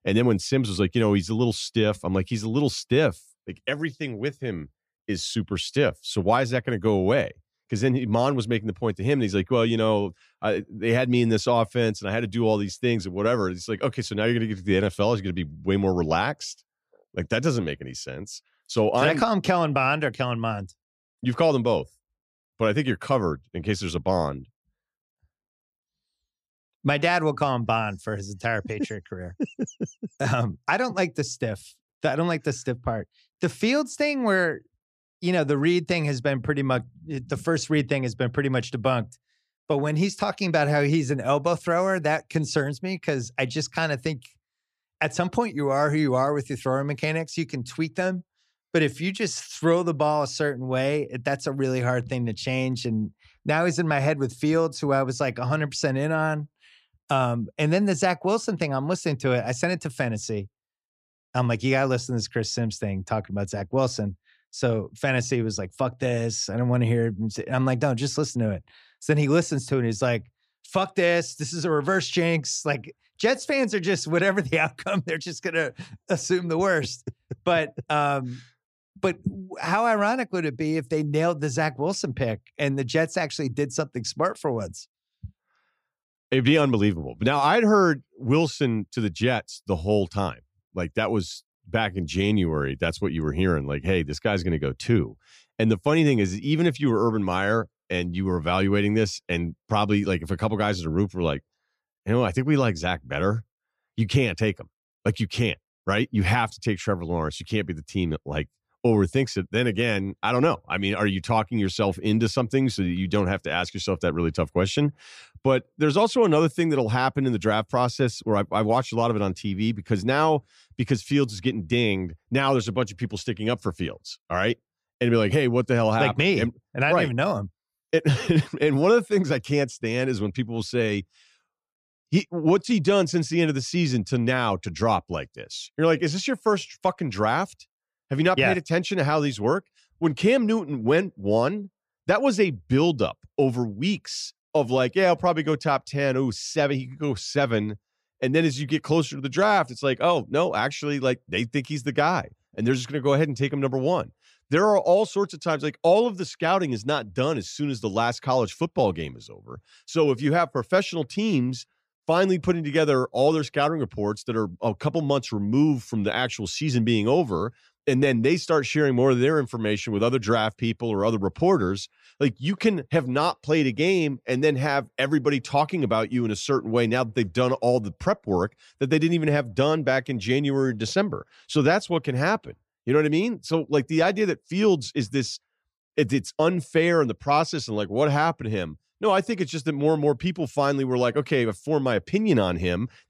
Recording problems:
none

